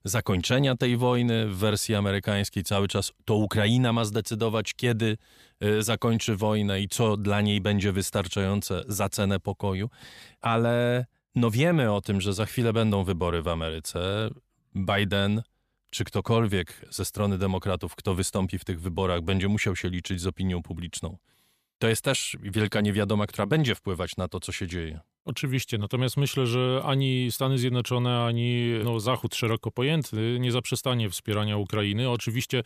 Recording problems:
none

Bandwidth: 14.5 kHz